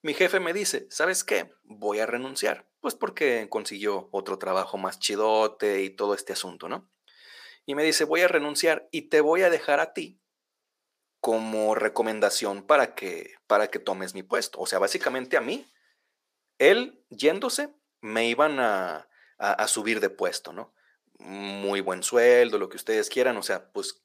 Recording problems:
thin; somewhat; fading below 500 Hz

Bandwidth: 15 kHz